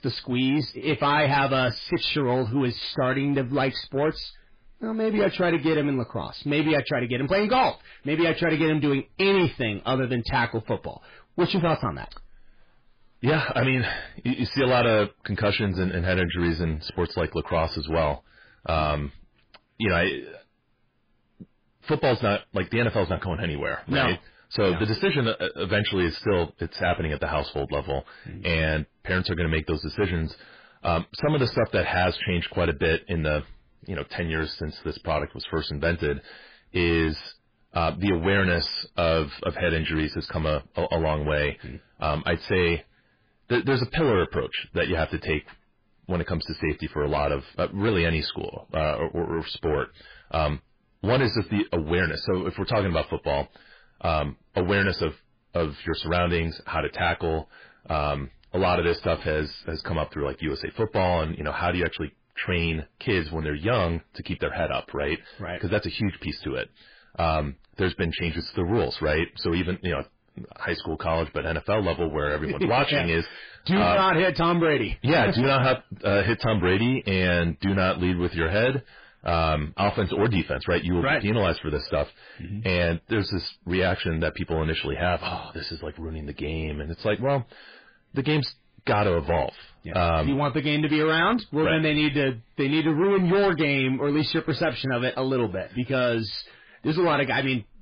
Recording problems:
distortion; heavy; 6 dB below the speech
garbled, watery; badly

